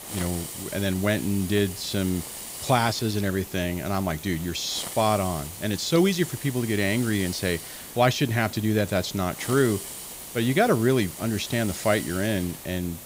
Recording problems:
hiss; noticeable; throughout; 10 dB below the speech

